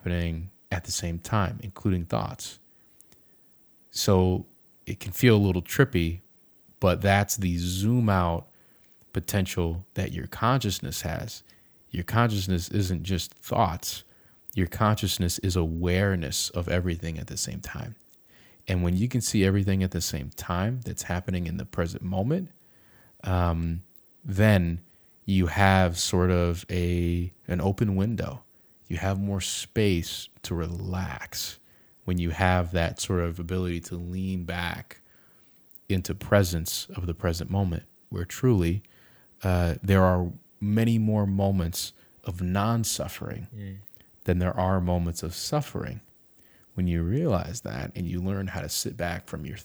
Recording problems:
none

